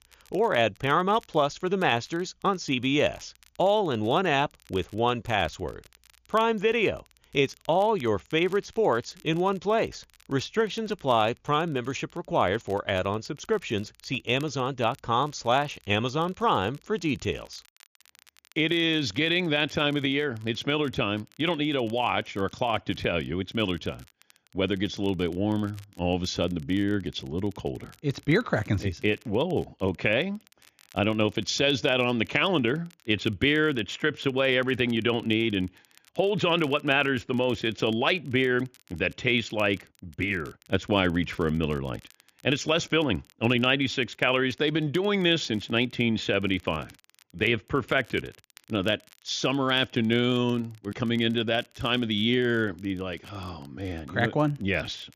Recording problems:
high frequencies cut off; noticeable; nothing above 7 kHz
crackle, like an old record; faint; 30 dB below the speech

